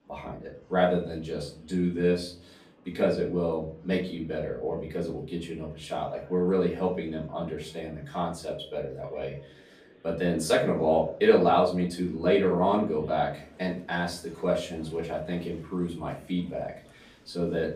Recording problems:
off-mic speech; far
room echo; slight; dies away in 0.4 s
murmuring crowd; faint; throughout; 30 dB below the speech

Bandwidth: 15 kHz